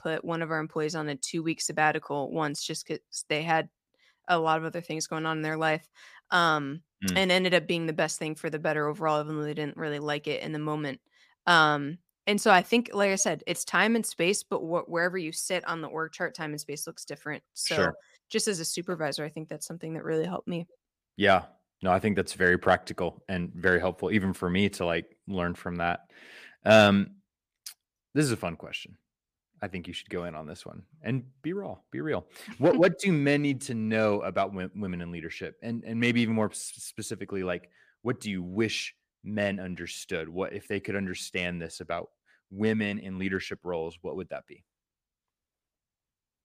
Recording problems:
none

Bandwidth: 15 kHz